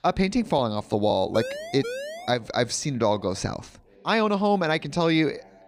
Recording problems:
voice in the background; faint; throughout; 25 dB below the speech
siren; noticeable; at 1.5 s; peak 8 dB below the speech

